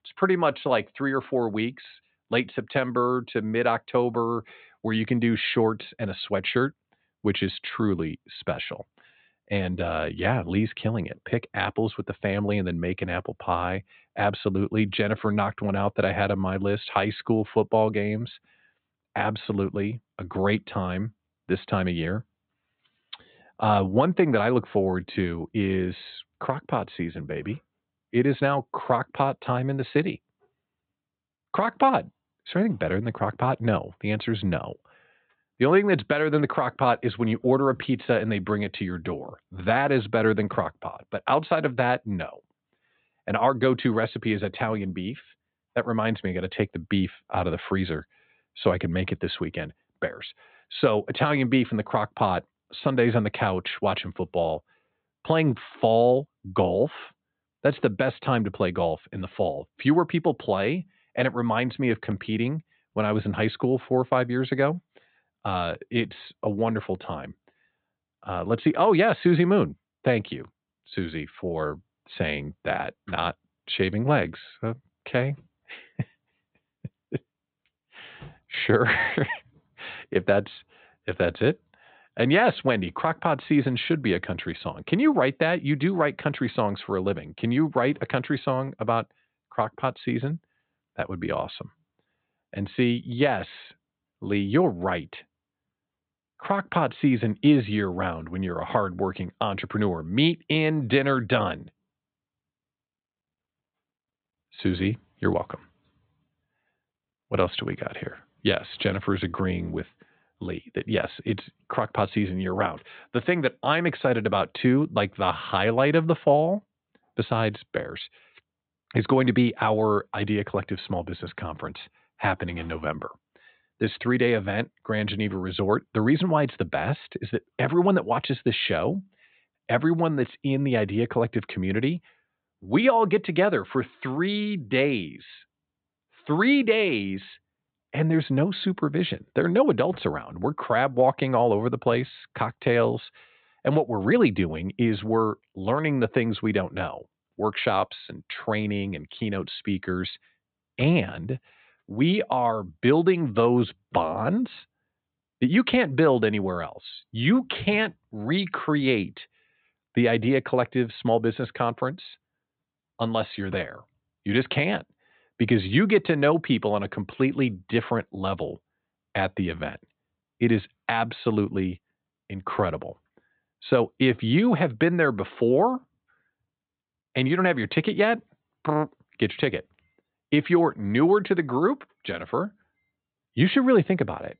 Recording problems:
high frequencies cut off; severe; nothing above 4 kHz

